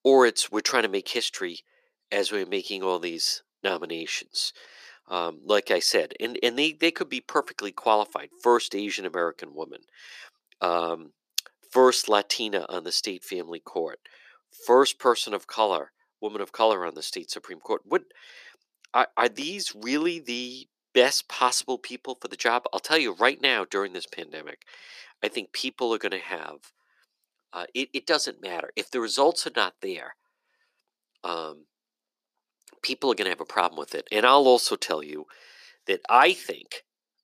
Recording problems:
thin; somewhat; fading below 350 Hz

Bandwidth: 14.5 kHz